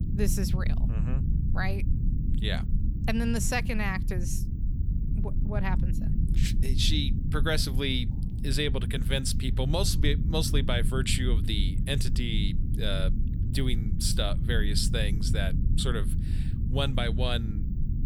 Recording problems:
low rumble; noticeable; throughout; 10 dB below the speech

